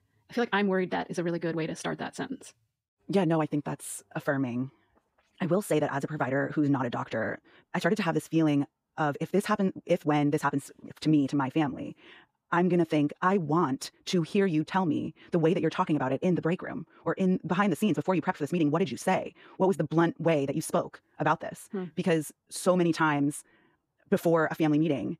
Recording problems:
wrong speed, natural pitch; too fast; 1.6 times normal speed

